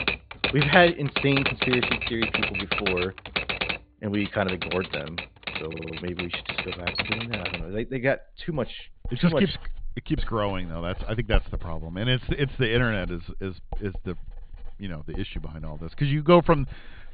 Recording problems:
high frequencies cut off; severe; nothing above 4.5 kHz
household noises; loud; throughout; 3 dB below the speech
audio stuttering; at 5.5 s

